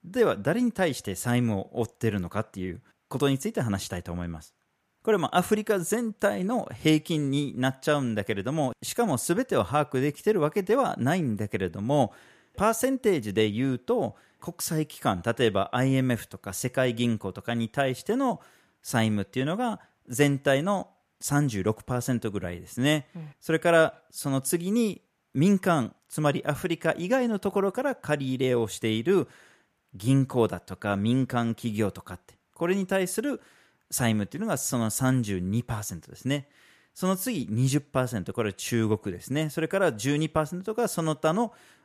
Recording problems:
none

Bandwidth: 14.5 kHz